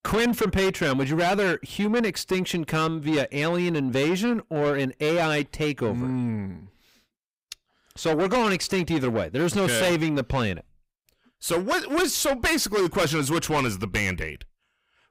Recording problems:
distortion; heavy; 6 dB below the speech

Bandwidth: 15.5 kHz